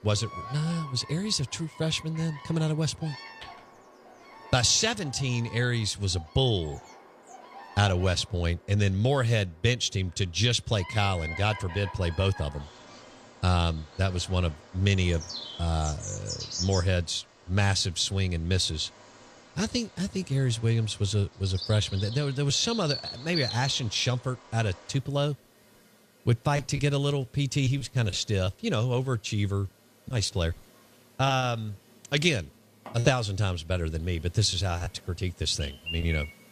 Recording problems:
animal sounds; noticeable; throughout; 10 dB below the speech

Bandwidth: 14.5 kHz